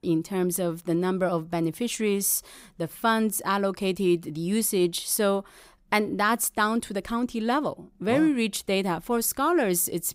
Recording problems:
none

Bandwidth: 15.5 kHz